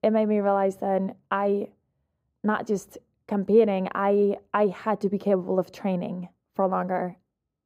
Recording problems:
muffled; very; fading above 1.5 kHz

